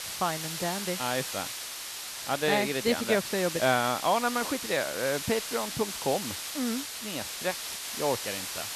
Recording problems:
hiss; loud; throughout; 4 dB below the speech

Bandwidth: 13.5 kHz